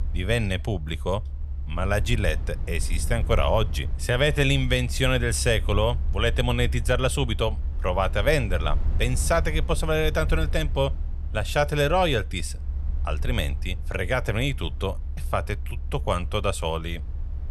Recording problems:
low rumble; faint; throughout; 20 dB below the speech

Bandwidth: 15 kHz